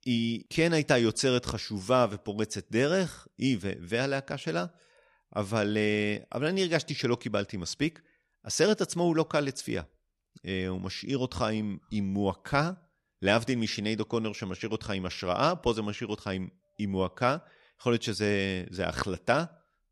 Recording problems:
none

